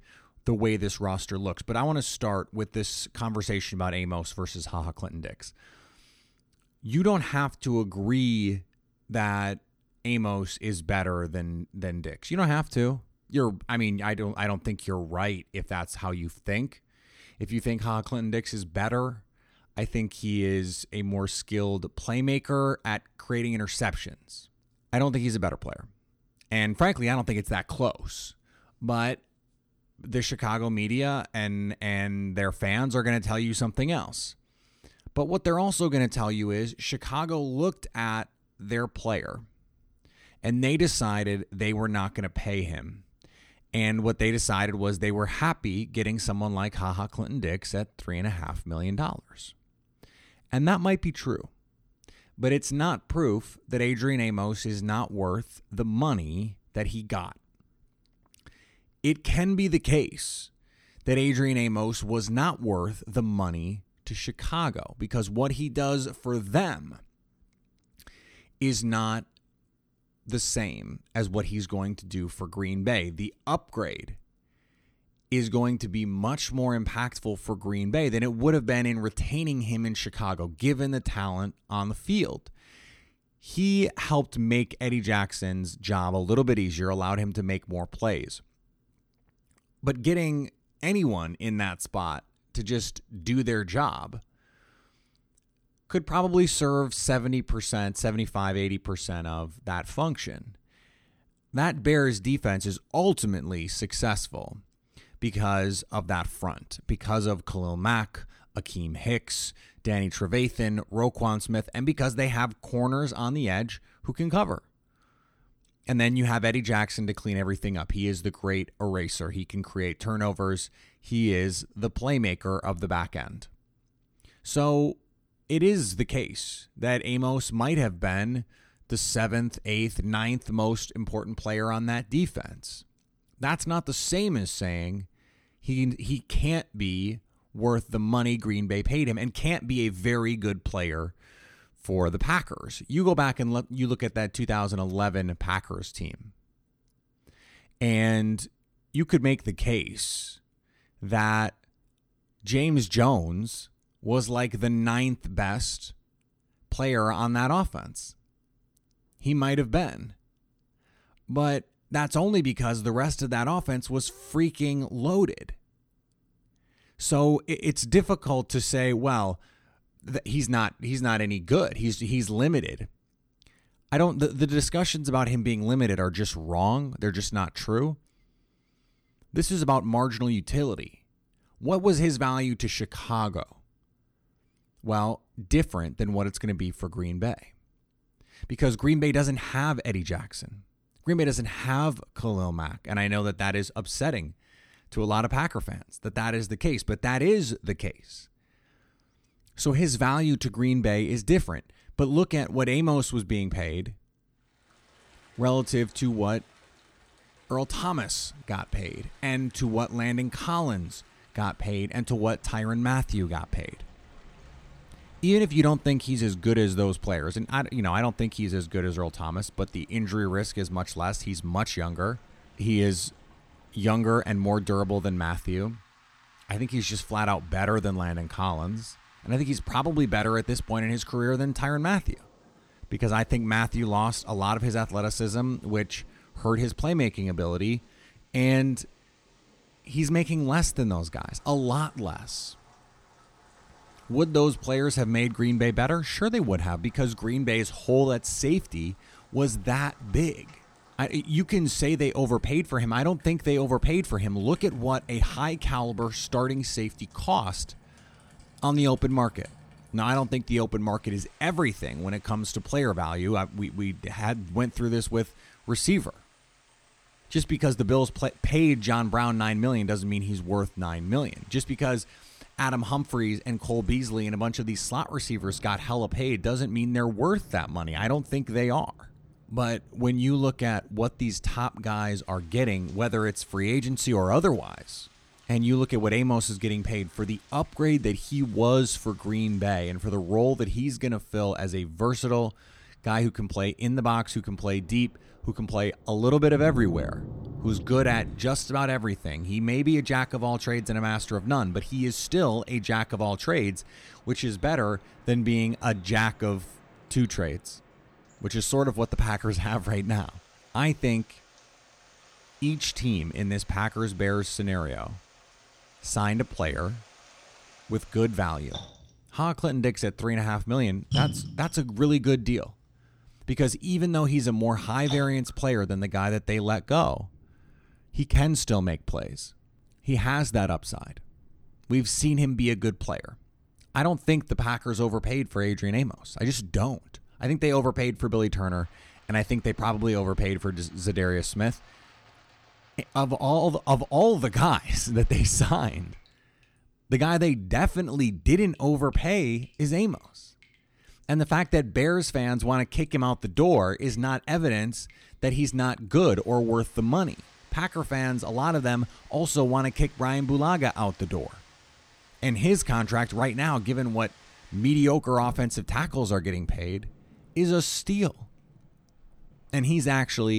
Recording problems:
rain or running water; faint; from 3:25 on; 20 dB below the speech
abrupt cut into speech; at the end

